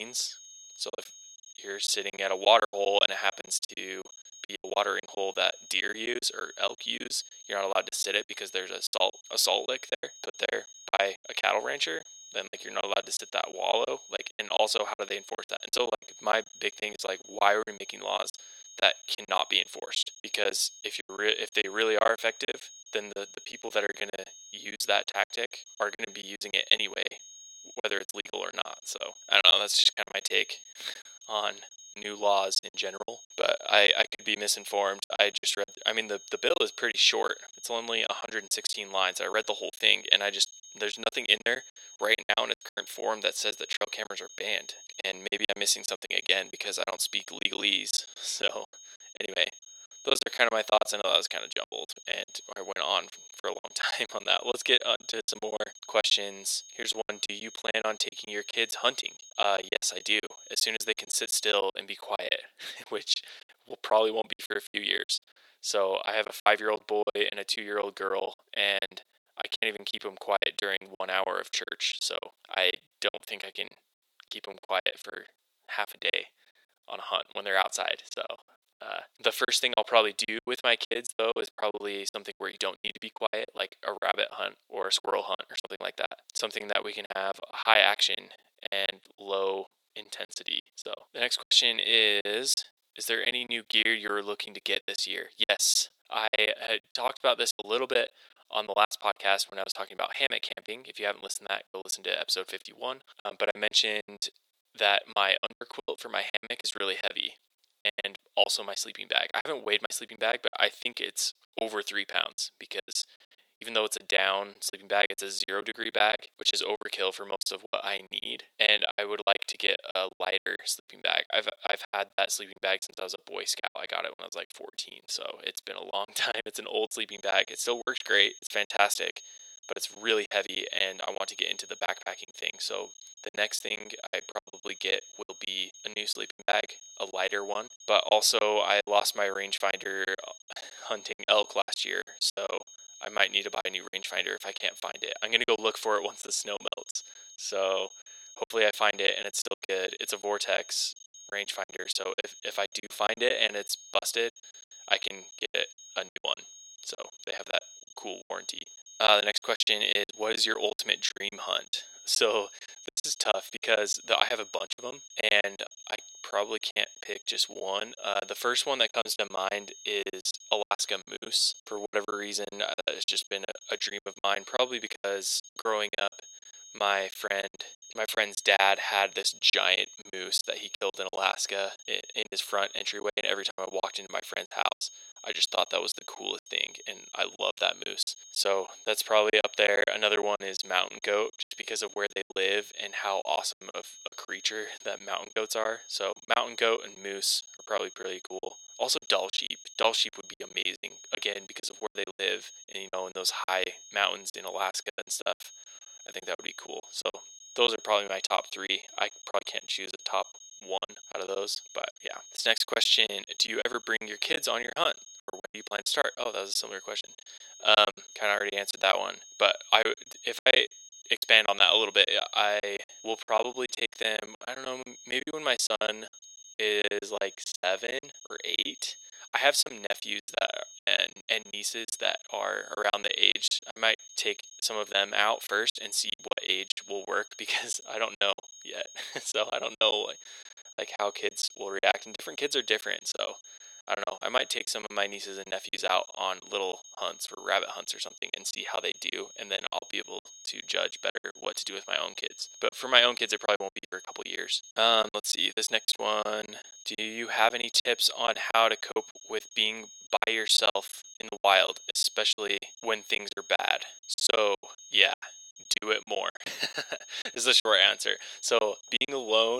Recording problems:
thin; very; fading below 500 Hz
high-pitched whine; noticeable; until 1:02 and from 2:07 on; 6.5 kHz, 20 dB below the speech
choppy; very; 15% of the speech affected
abrupt cut into speech; at the start and the end

